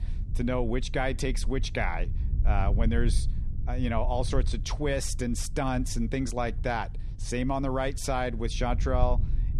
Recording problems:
low rumble; noticeable; throughout; 20 dB below the speech

